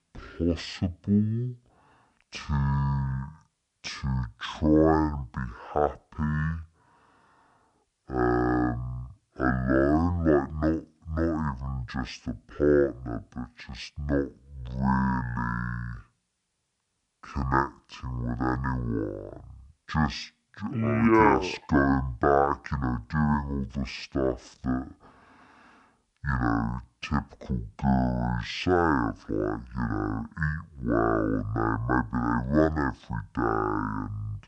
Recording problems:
wrong speed and pitch; too slow and too low; 0.5 times normal speed

